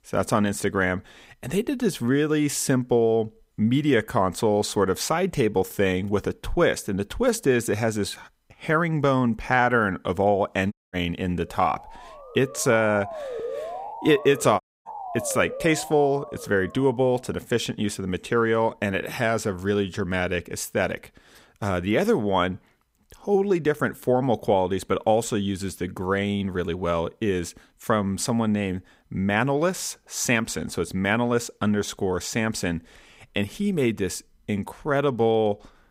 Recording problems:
audio cutting out; at 11 s and at 15 s
siren; noticeable; from 12 to 17 s; peak 7 dB below the speech

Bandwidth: 15.5 kHz